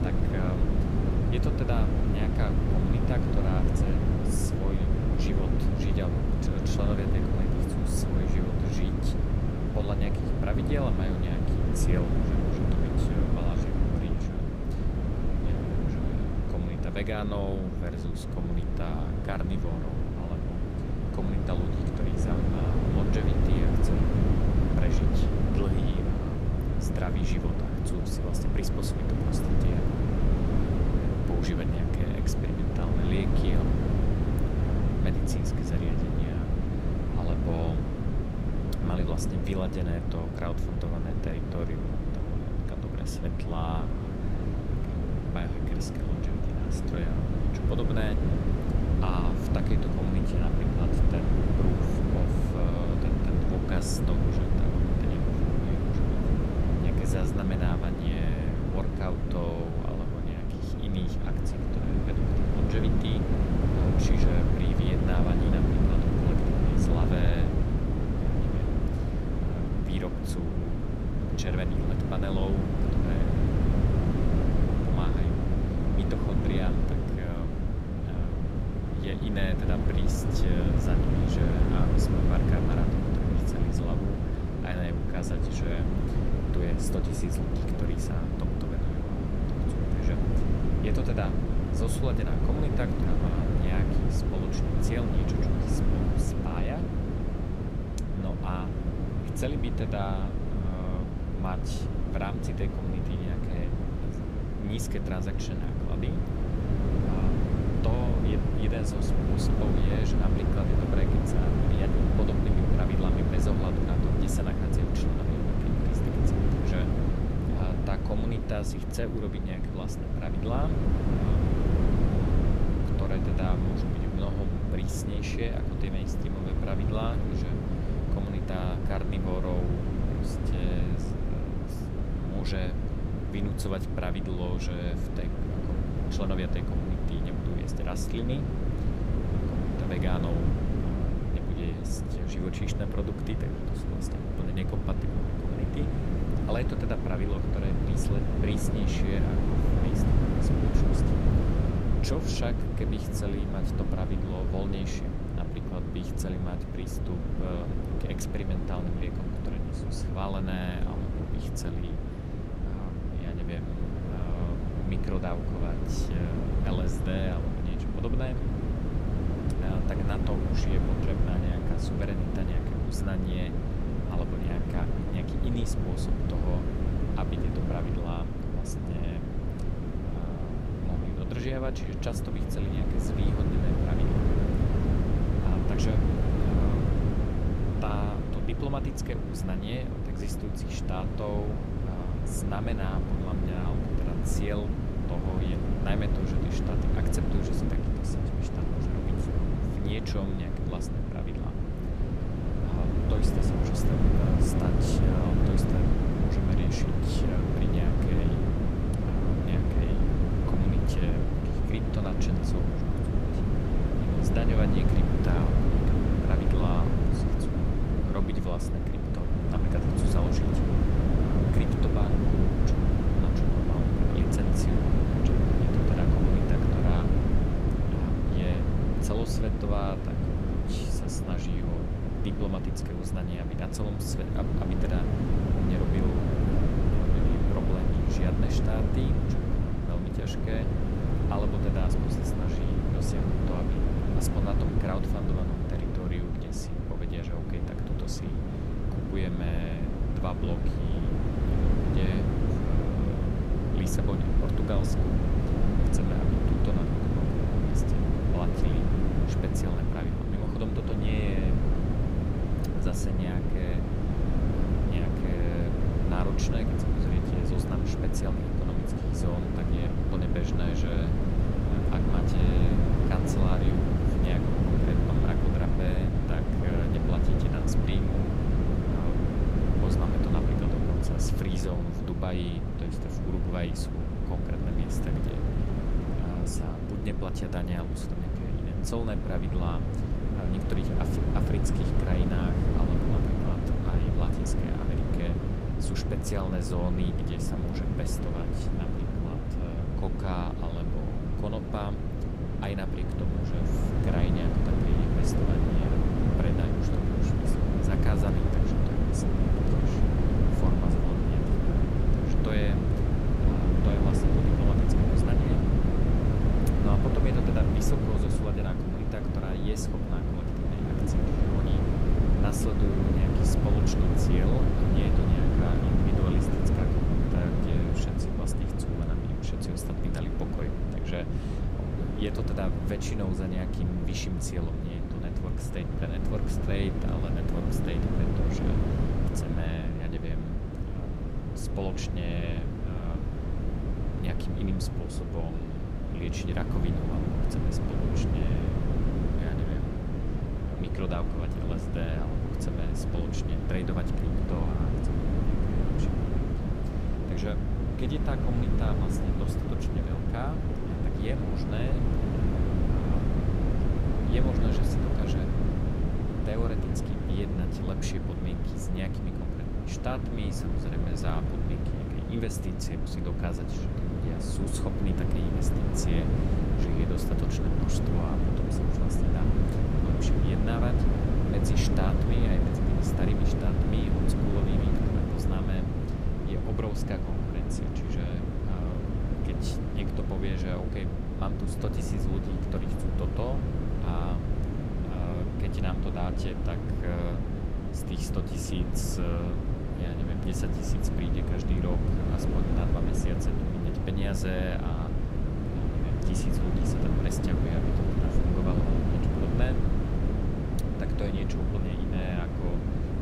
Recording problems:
wind noise on the microphone; heavy; 3 dB above the speech

